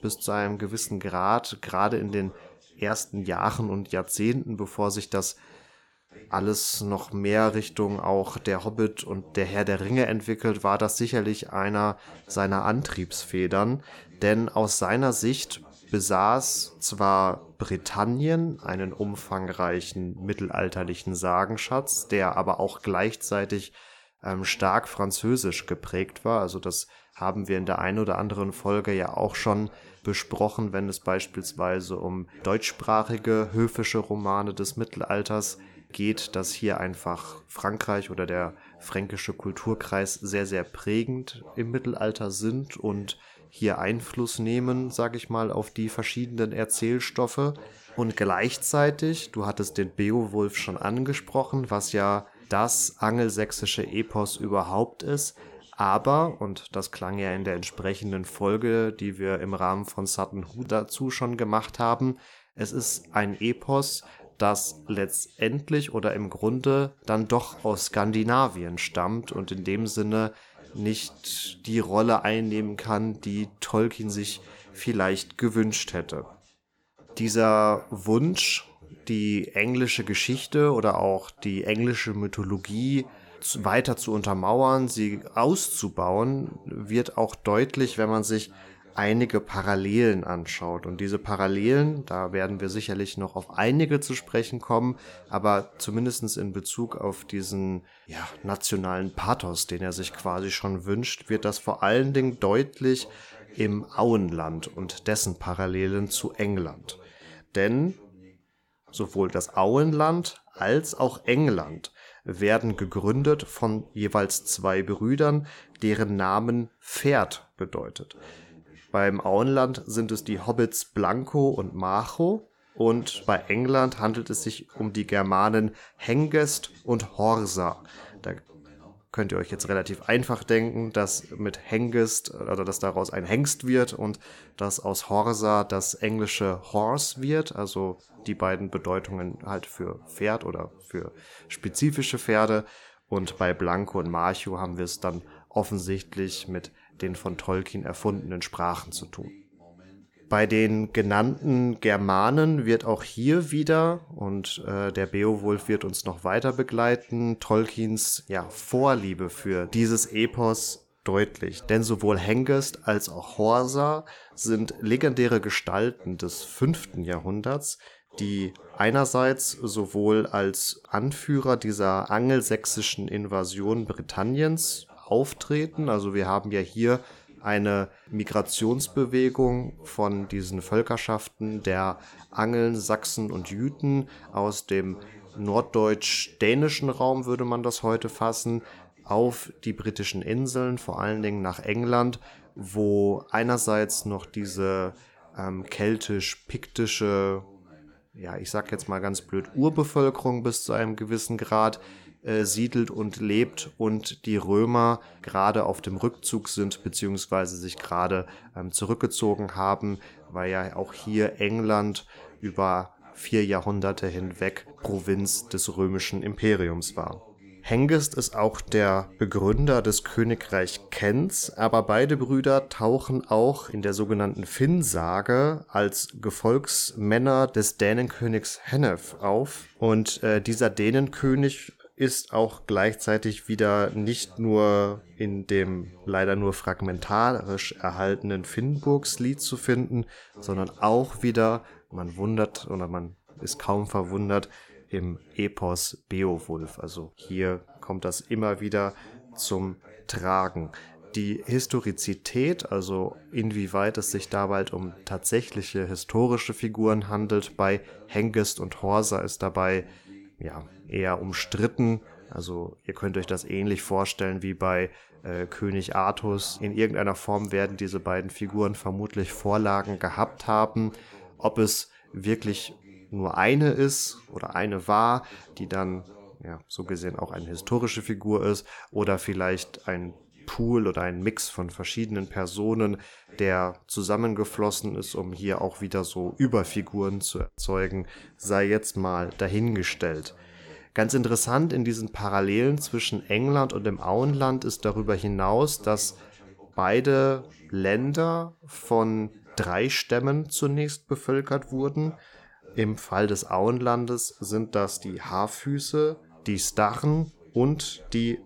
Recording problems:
voice in the background; faint; throughout; 25 dB below the speech

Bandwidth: 18 kHz